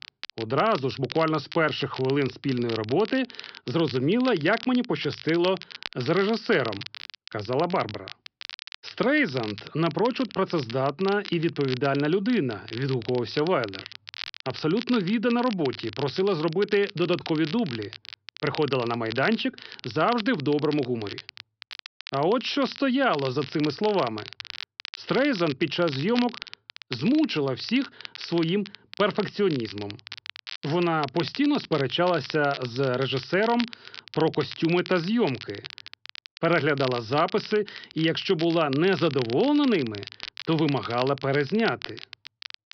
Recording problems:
high frequencies cut off; noticeable; nothing above 5.5 kHz
crackle, like an old record; noticeable; 15 dB below the speech

